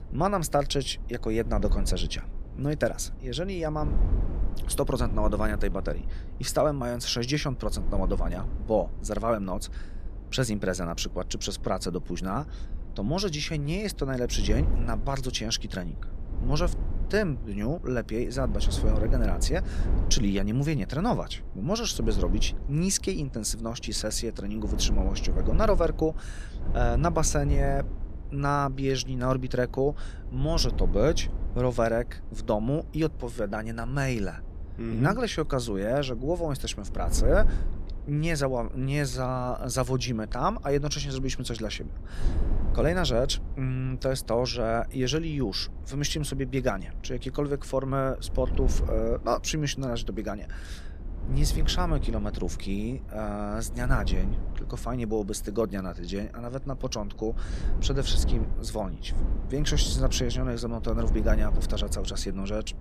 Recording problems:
wind noise on the microphone; occasional gusts; 15 dB below the speech

